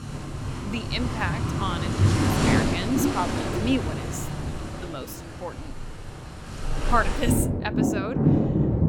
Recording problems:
rain or running water; very loud; throughout; 5 dB above the speech

